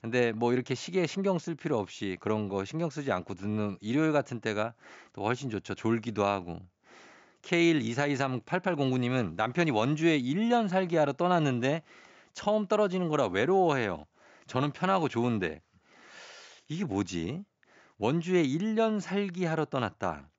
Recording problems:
high frequencies cut off; noticeable; nothing above 7.5 kHz

